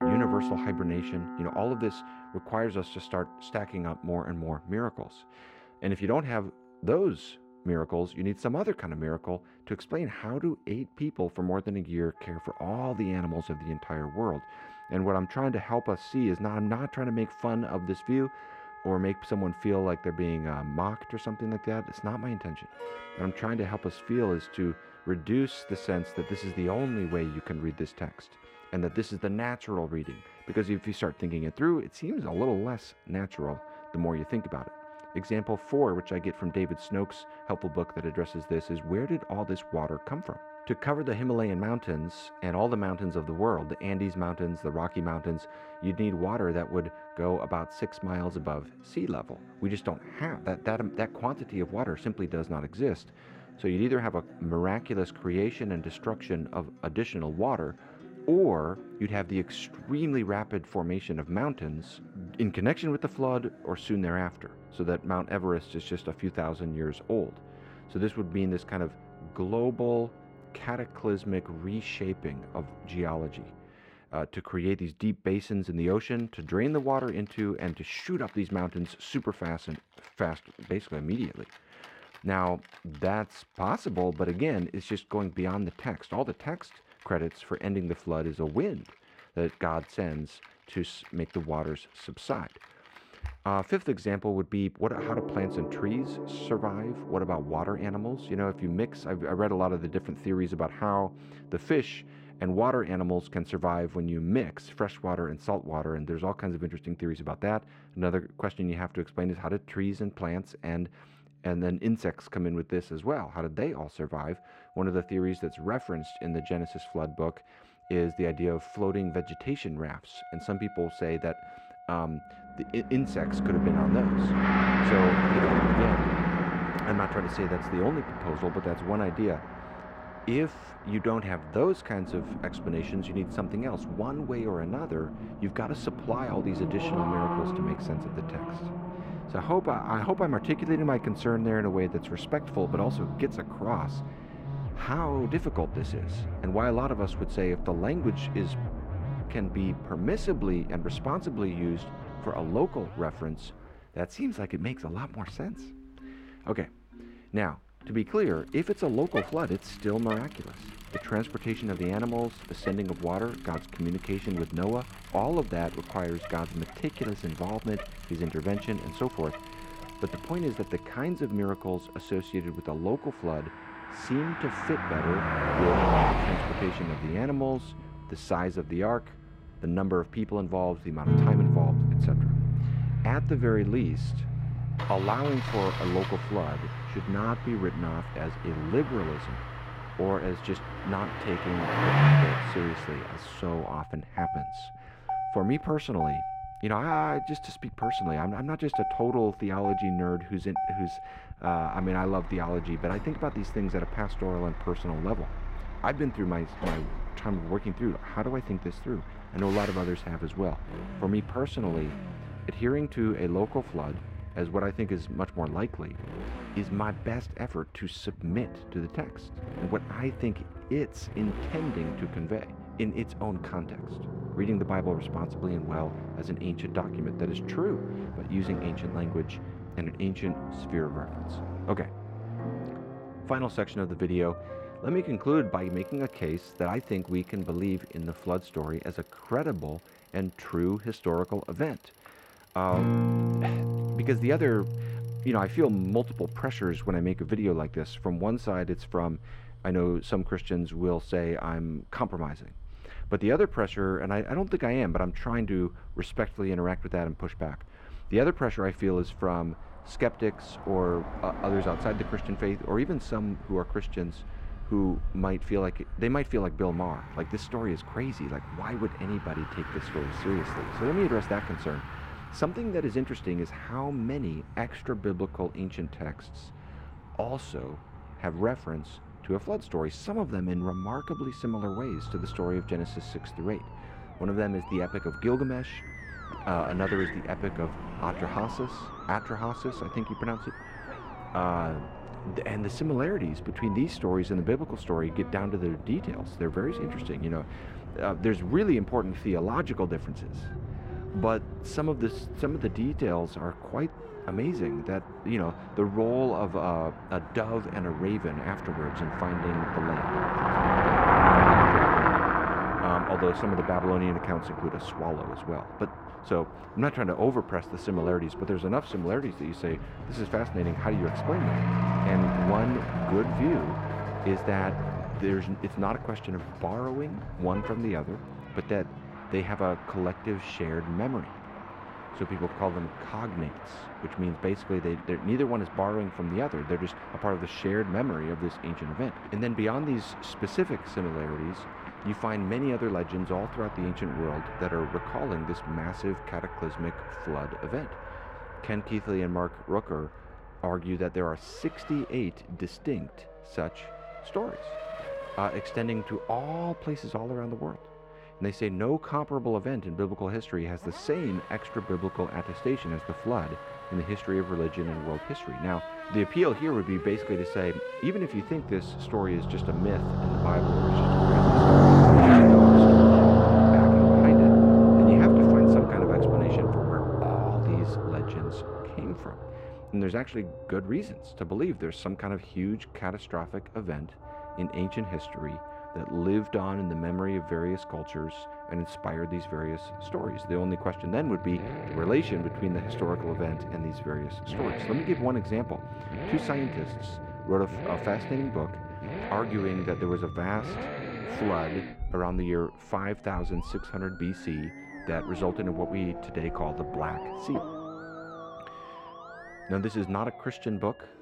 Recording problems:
muffled; slightly; fading above 4 kHz
traffic noise; very loud; from 2:02 on; 3 dB above the speech
background music; loud; throughout; 8 dB below the speech

